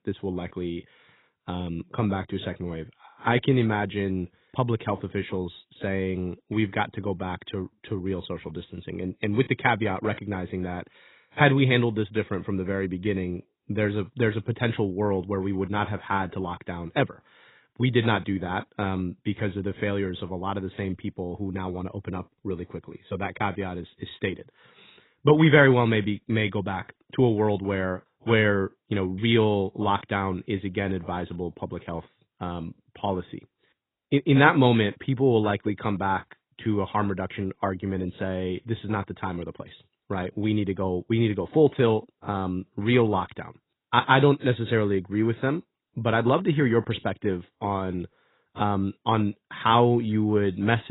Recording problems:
garbled, watery; badly; nothing above 4 kHz
abrupt cut into speech; at the end

